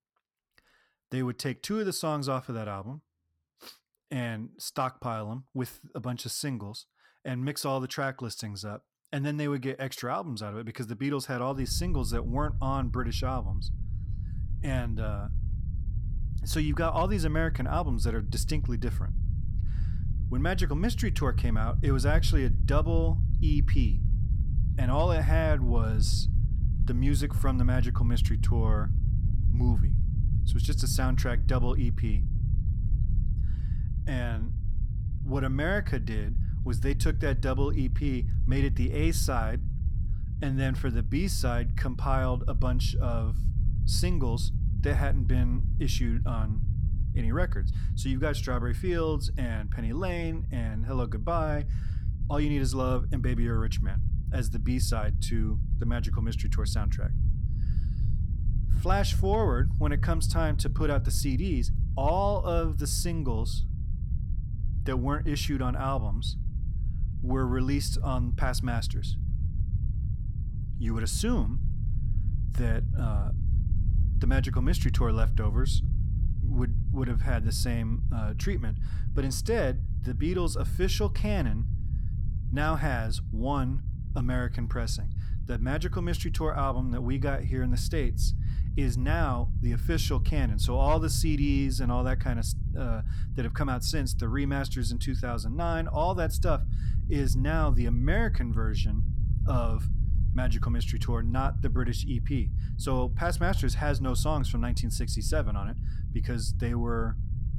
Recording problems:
low rumble; noticeable; from 12 s on; 15 dB below the speech

